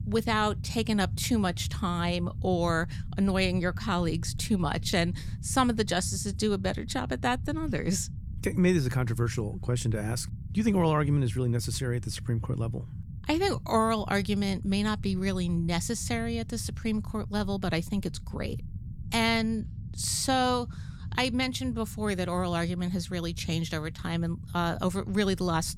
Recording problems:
low rumble; faint; throughout; 20 dB below the speech

